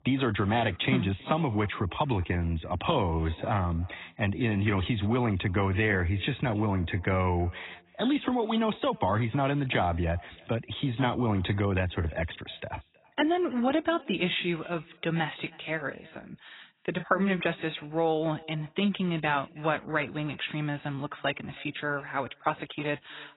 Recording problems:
garbled, watery; badly; nothing above 4 kHz
echo of what is said; faint; throughout; 320 ms later, 25 dB below the speech

